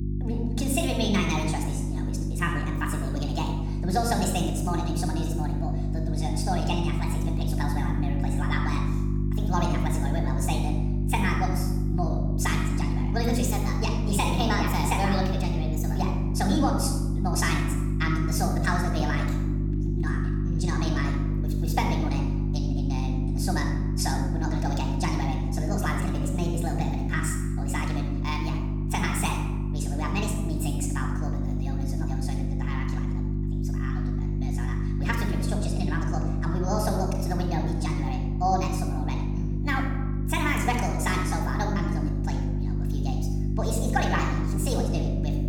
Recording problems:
wrong speed and pitch; too fast and too high; 1.5 times normal speed
room echo; noticeable; dies away in 0.9 s
off-mic speech; somewhat distant
electrical hum; loud; throughout; 50 Hz, 7 dB below the speech

